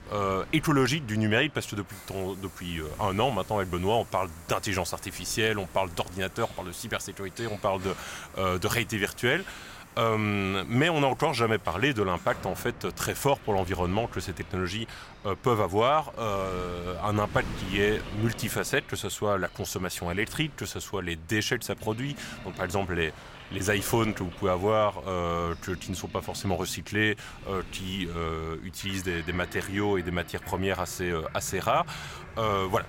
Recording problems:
train or aircraft noise; noticeable; throughout; 20 dB below the speech
wind noise on the microphone; occasional gusts; 20 dB below the speech

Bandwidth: 16 kHz